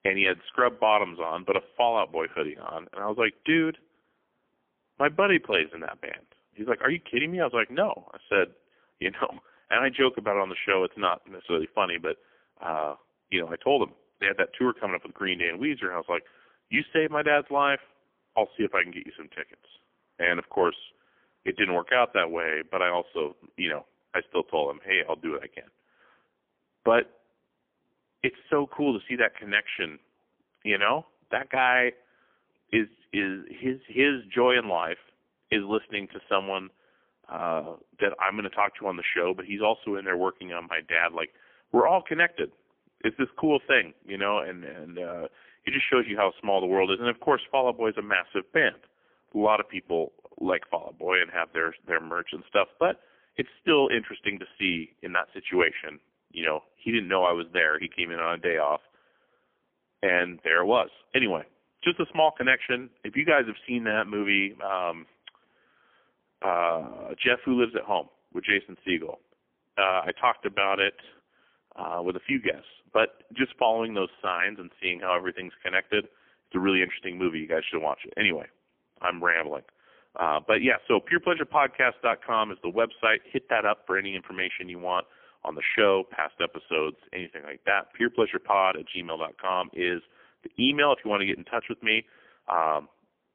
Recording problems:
phone-call audio; poor line; nothing above 3.5 kHz

